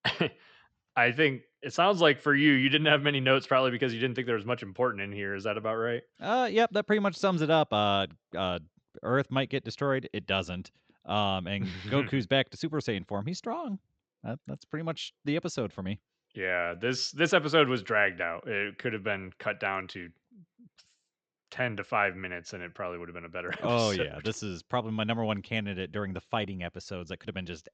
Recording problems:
high frequencies cut off; noticeable; nothing above 8 kHz

